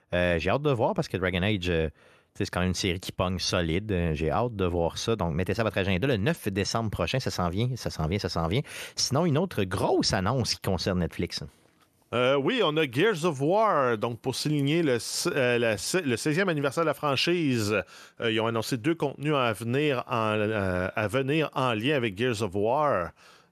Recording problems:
none

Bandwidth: 13.5 kHz